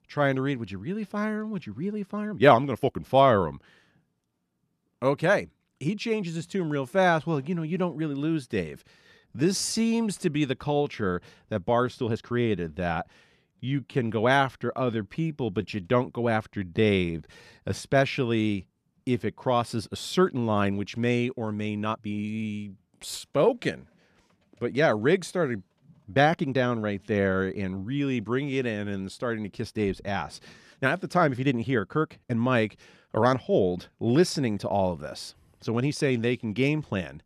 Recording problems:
uneven, jittery; strongly; from 2 to 36 s

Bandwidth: 14 kHz